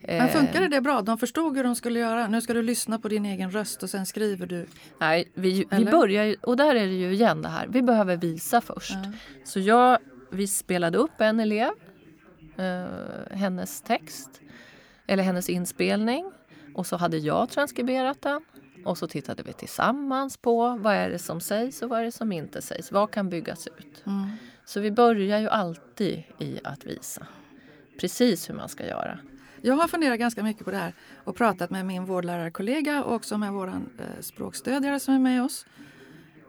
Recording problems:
voice in the background; faint; throughout; 25 dB below the speech

